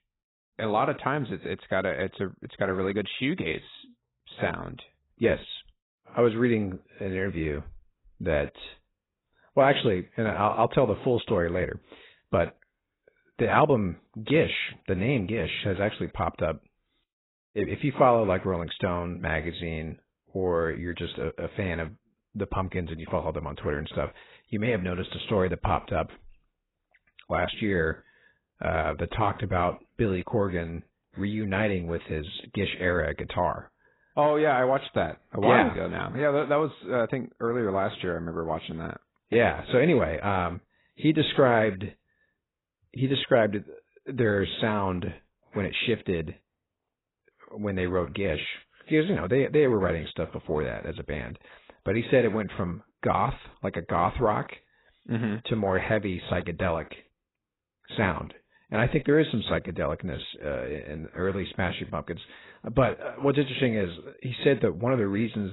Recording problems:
garbled, watery; badly; nothing above 4 kHz
abrupt cut into speech; at the end

